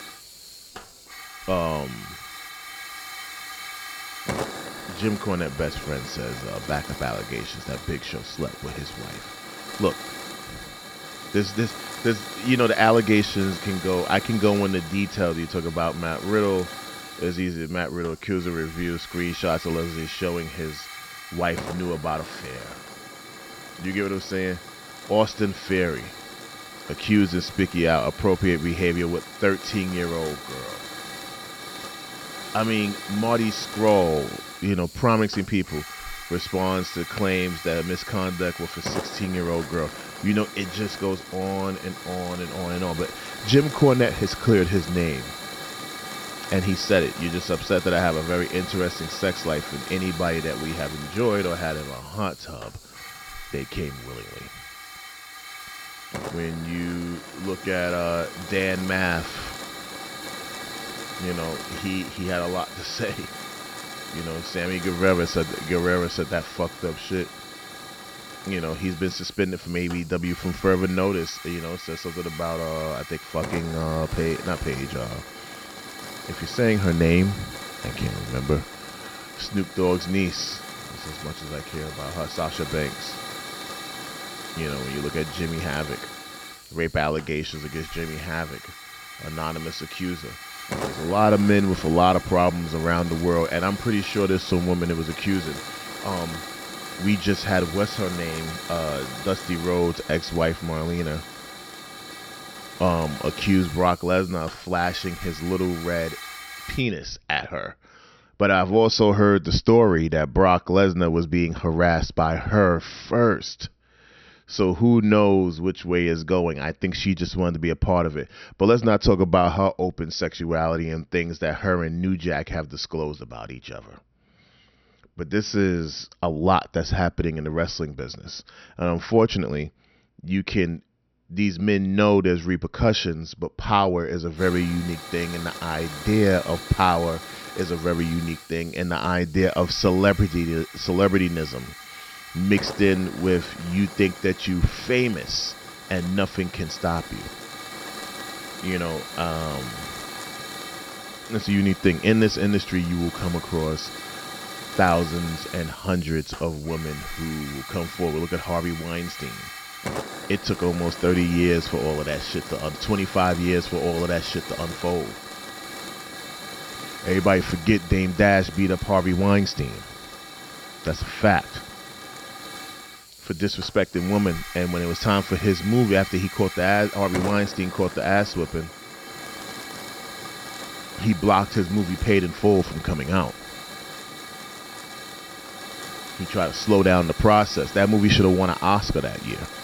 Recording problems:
high frequencies cut off; noticeable; nothing above 6 kHz
hiss; noticeable; until 1:47 and from 2:14 on; 10 dB below the speech

